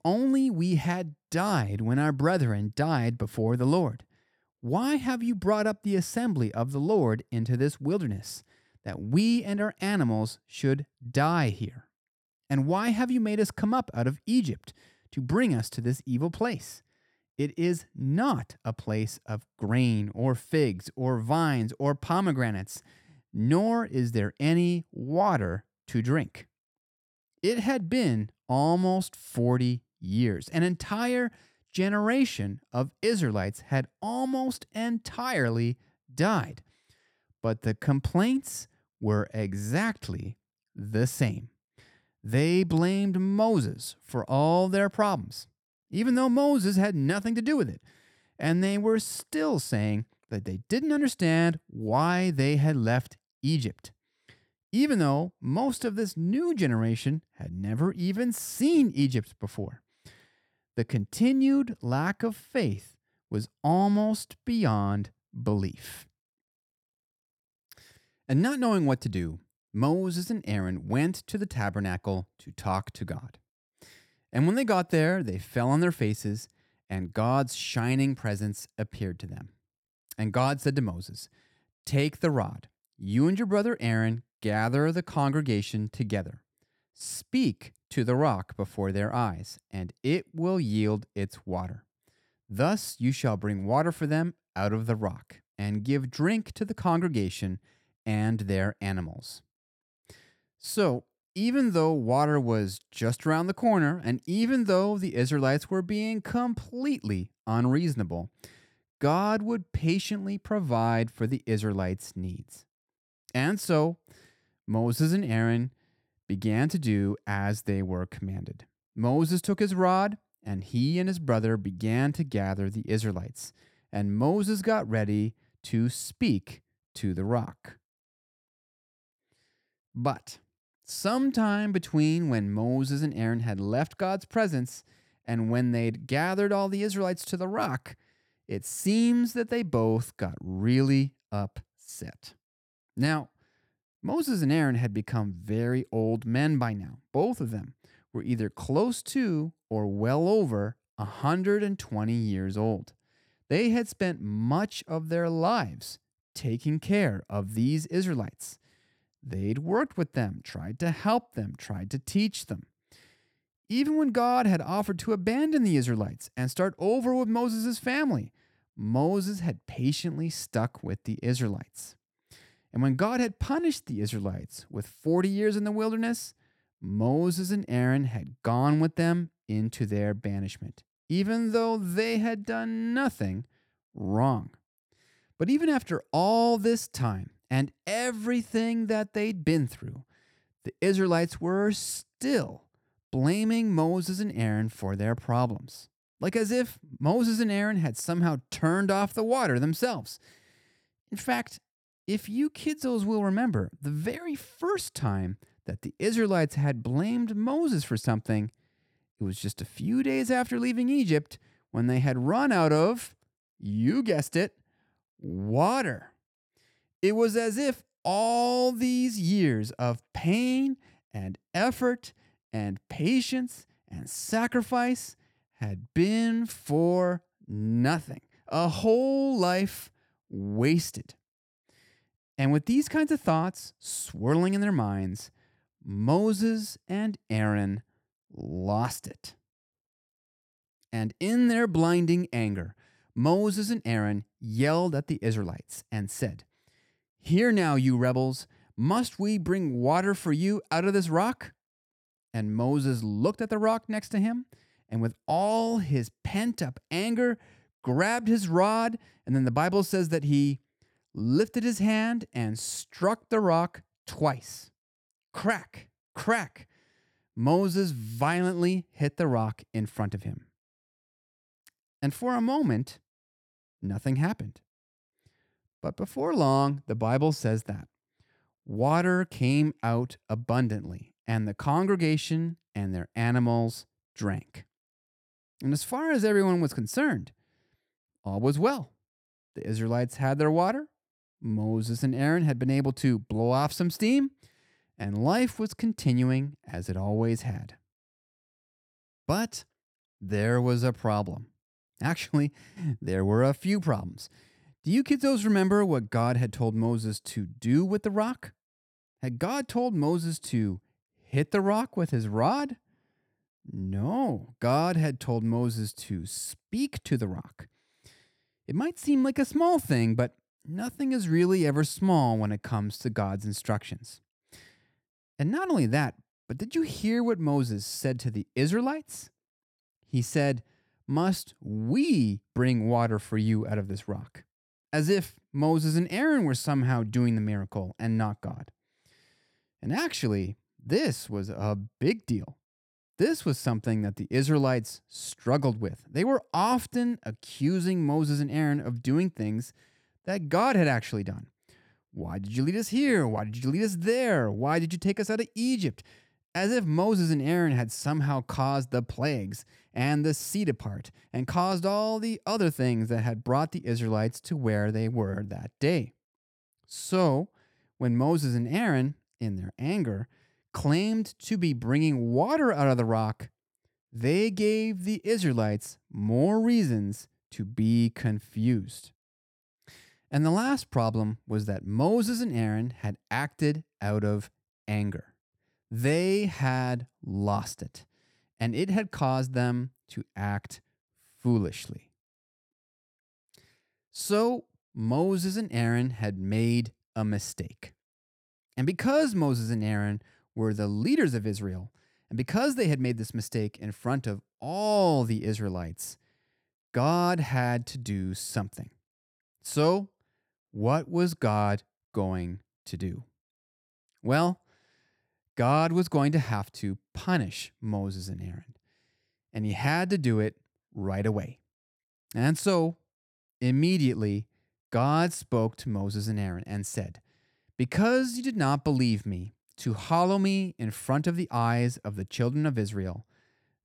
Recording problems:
none

